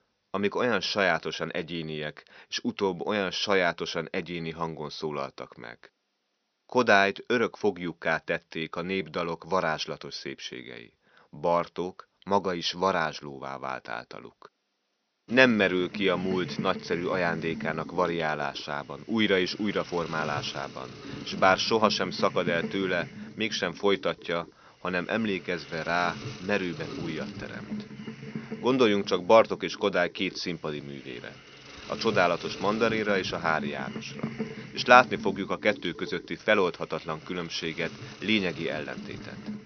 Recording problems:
high frequencies cut off; noticeable; nothing above 6 kHz
hiss; noticeable; from 15 s on; 15 dB below the speech

